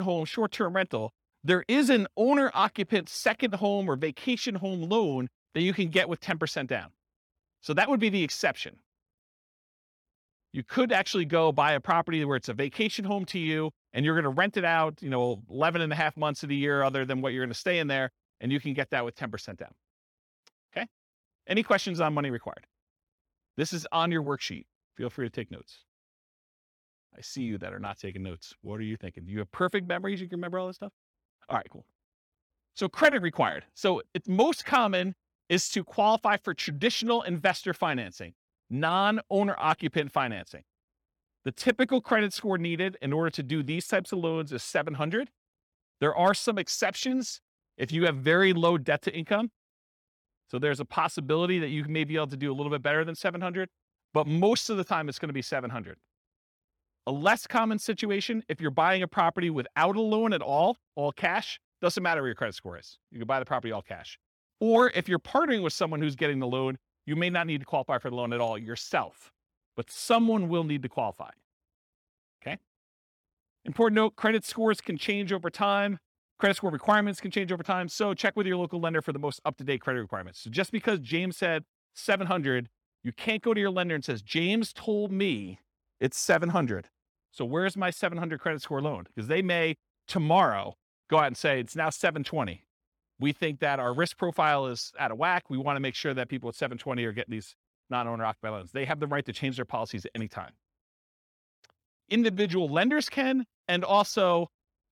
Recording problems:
abrupt cut into speech; at the start

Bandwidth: 18 kHz